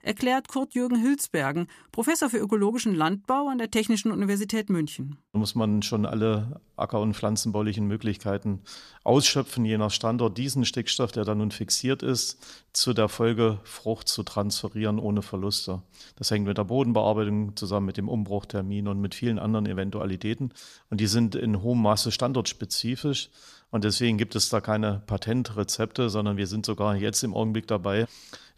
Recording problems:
none

